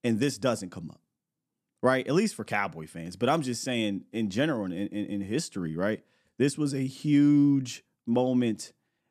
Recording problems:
none

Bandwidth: 14 kHz